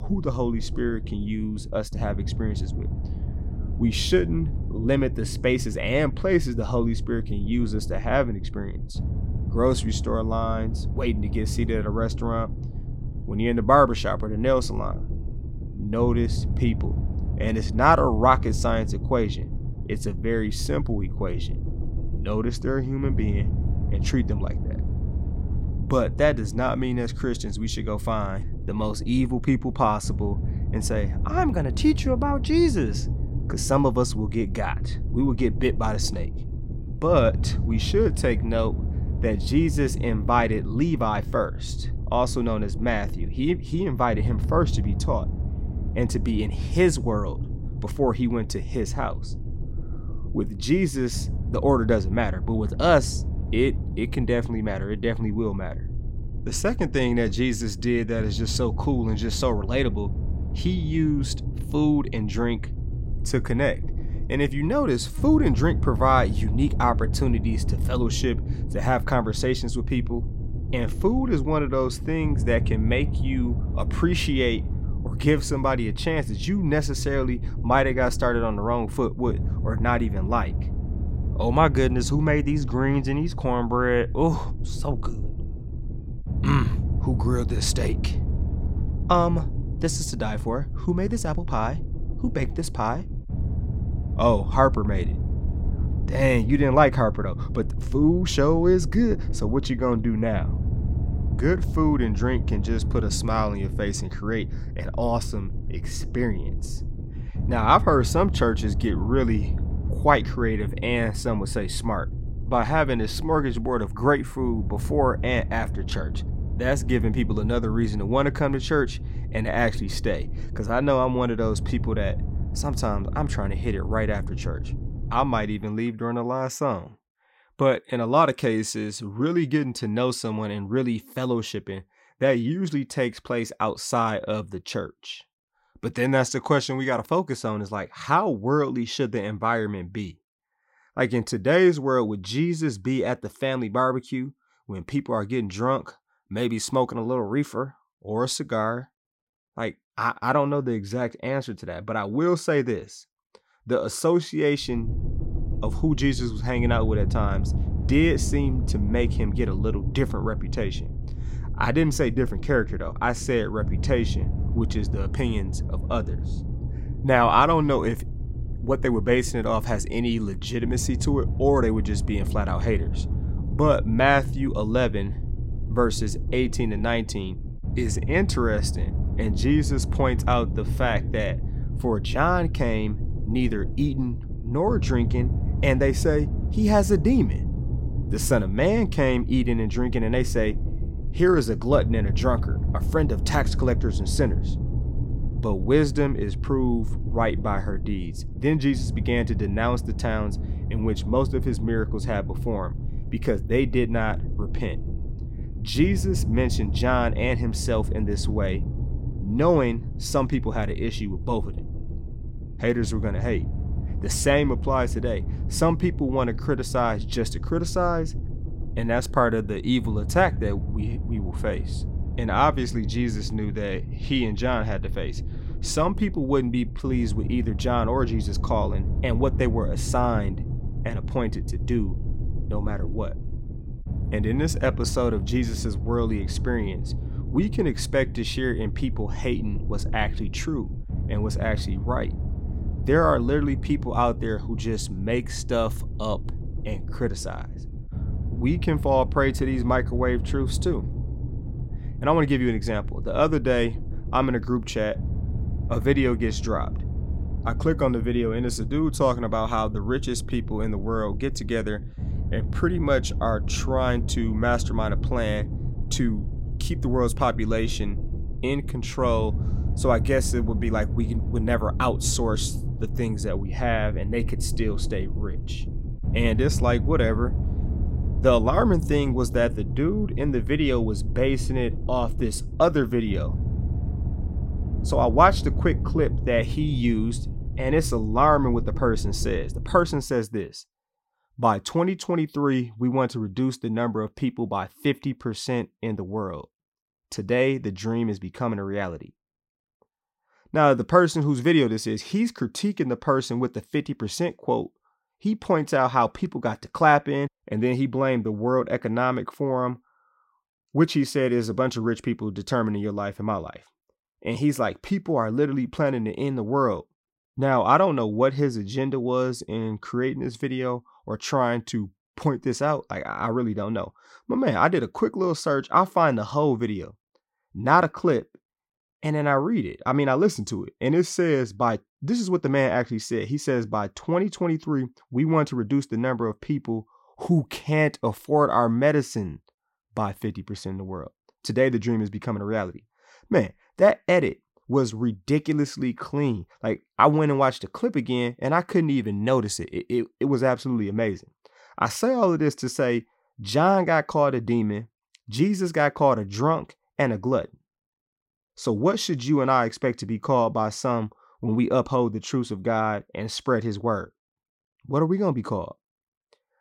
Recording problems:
low rumble; noticeable; until 2:06 and from 2:35 to 4:50; 15 dB below the speech

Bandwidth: 16 kHz